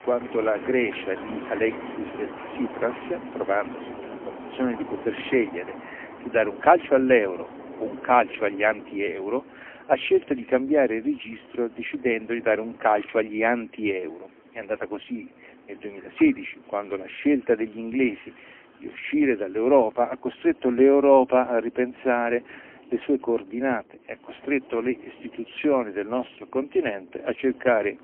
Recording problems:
phone-call audio; poor line
wind in the background; noticeable; throughout; 15 dB below the speech
household noises; faint; throughout; 25 dB below the speech

